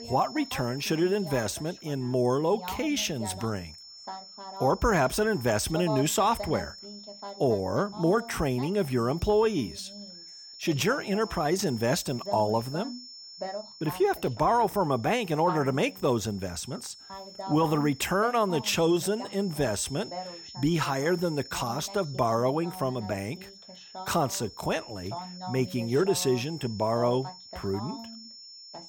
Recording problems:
high-pitched whine; noticeable; throughout; 5.5 kHz, 15 dB below the speech
voice in the background; noticeable; throughout; 15 dB below the speech

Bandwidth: 17 kHz